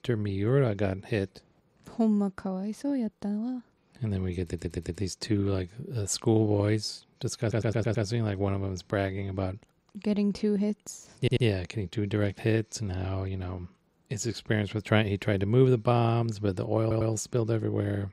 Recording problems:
audio stuttering; 4 times, first at 4.5 s

